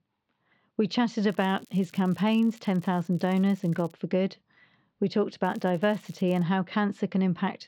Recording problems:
muffled; slightly; fading above 4 kHz
crackling; faint; from 1.5 to 4 s and at 5.5 s; 30 dB below the speech

